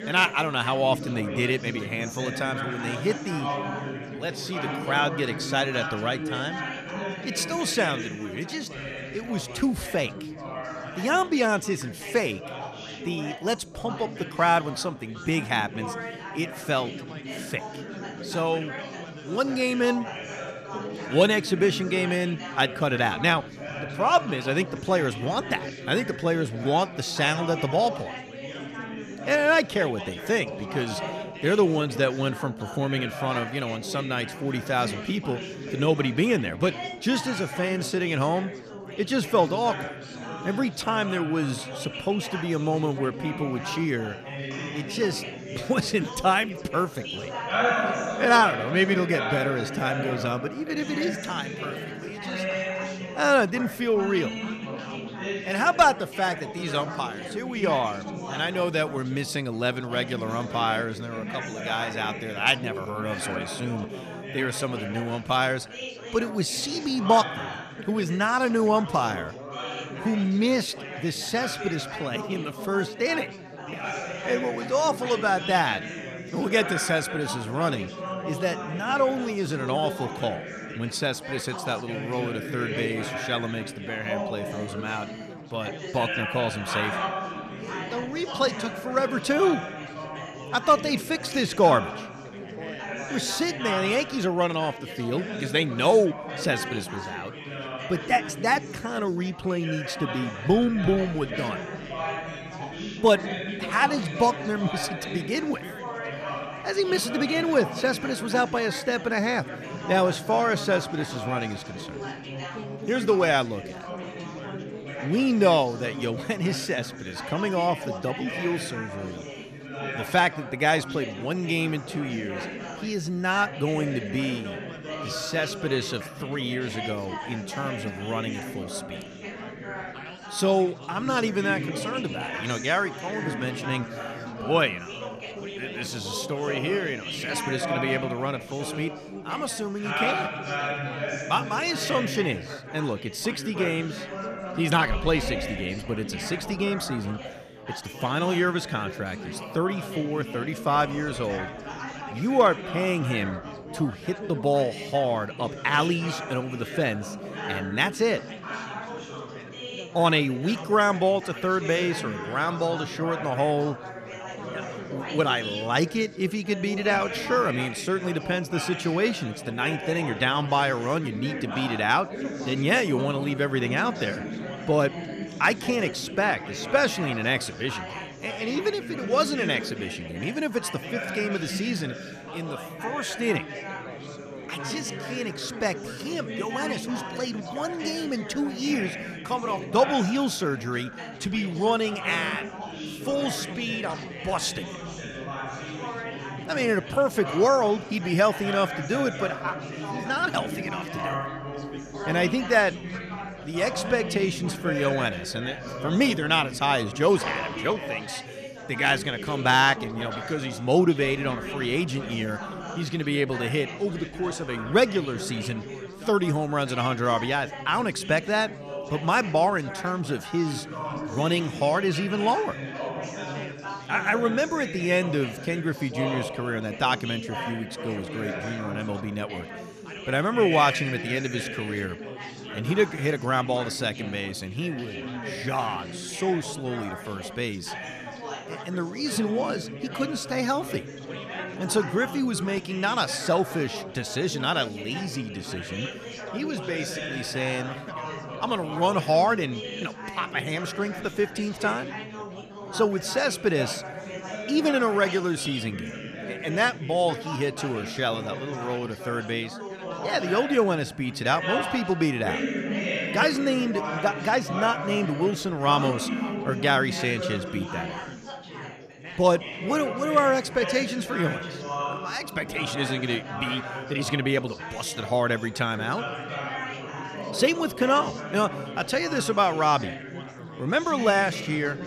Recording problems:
chatter from many people; loud; throughout; 8 dB below the speech

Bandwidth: 14.5 kHz